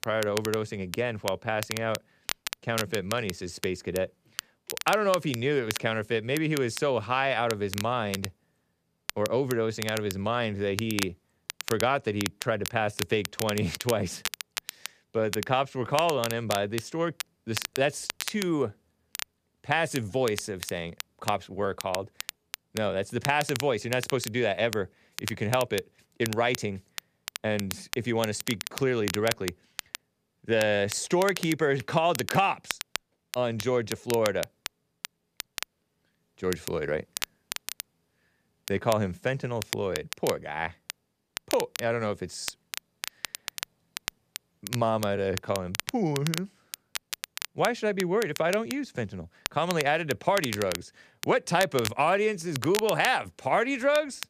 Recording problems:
crackle, like an old record; loud; 9 dB below the speech

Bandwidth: 14.5 kHz